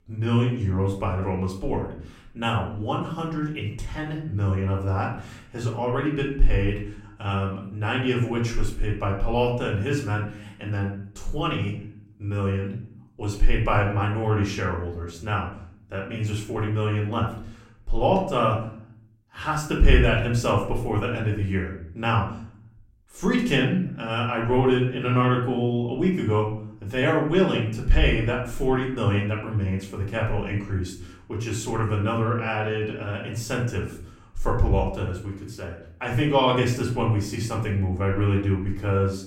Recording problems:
off-mic speech; far
room echo; slight; dies away in 0.5 s

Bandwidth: 16 kHz